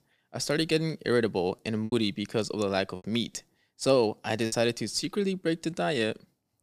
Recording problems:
choppy; occasionally; from 2 to 3 s and from 4.5 to 5.5 s; 5% of the speech affected

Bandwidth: 15 kHz